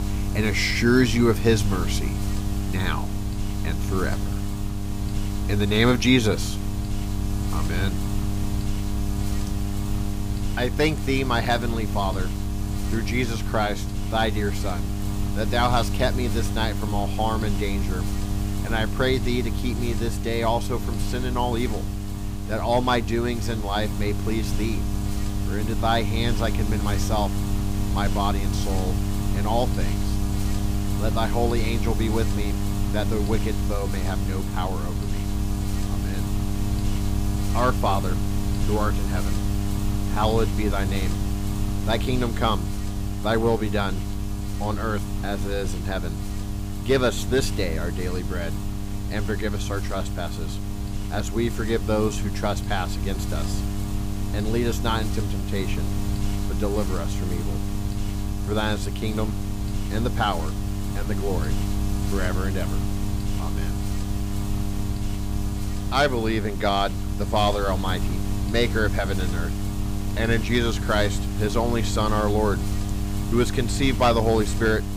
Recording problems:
electrical hum; loud; throughout; 50 Hz, 9 dB below the speech

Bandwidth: 15.5 kHz